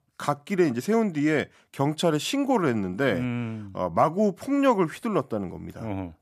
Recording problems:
none

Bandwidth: 14.5 kHz